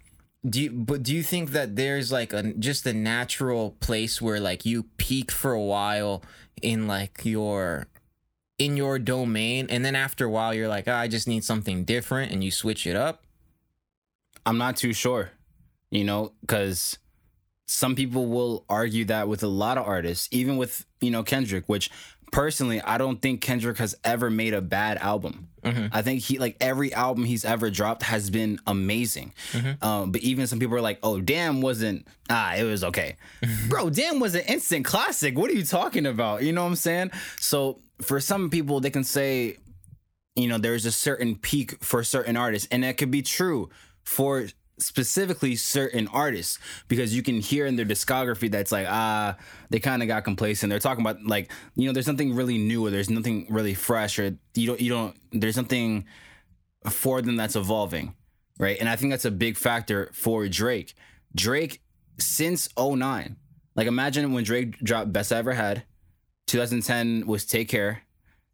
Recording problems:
squashed, flat; somewhat

